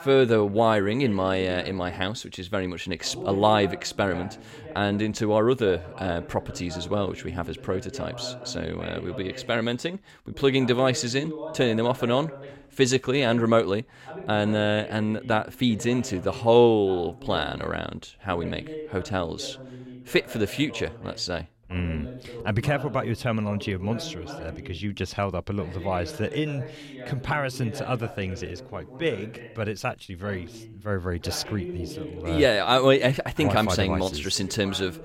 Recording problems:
voice in the background; noticeable; throughout; 15 dB below the speech

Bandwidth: 16 kHz